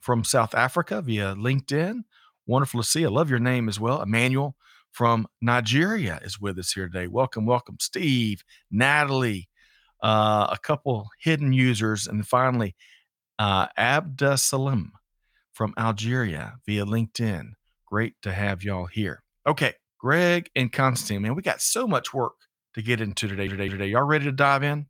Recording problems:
audio stuttering; at 23 s

